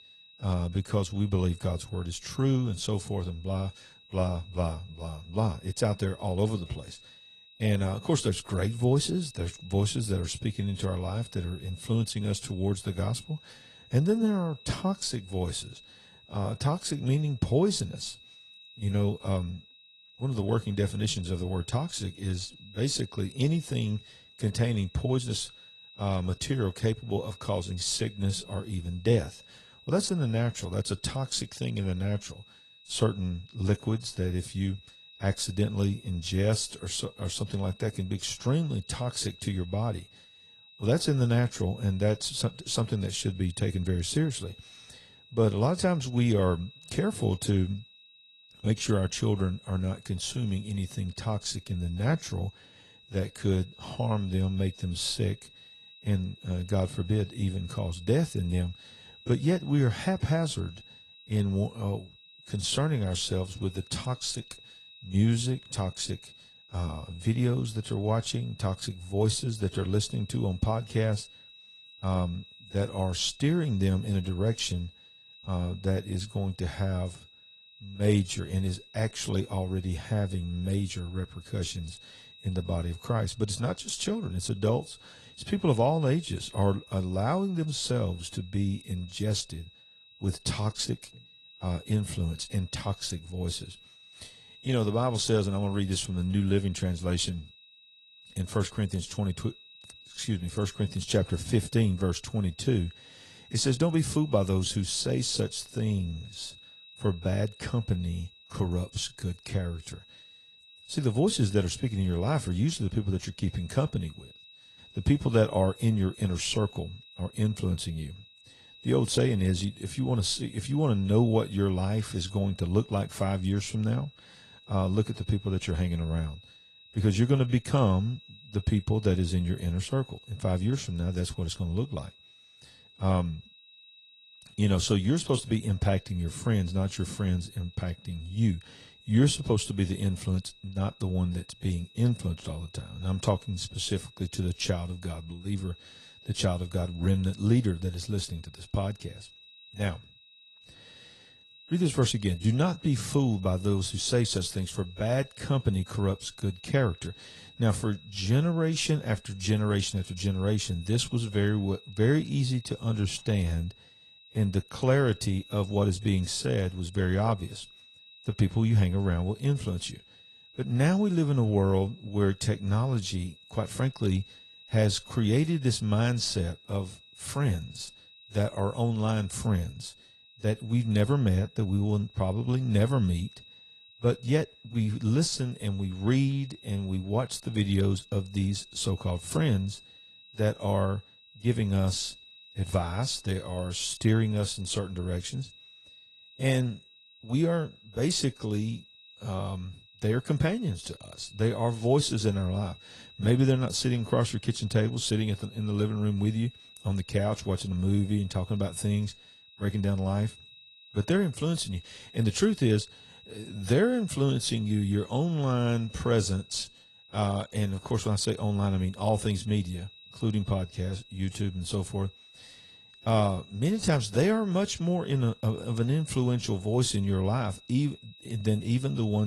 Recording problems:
garbled, watery; slightly
high-pitched whine; faint; throughout; 4 kHz, 20 dB below the speech
abrupt cut into speech; at the end

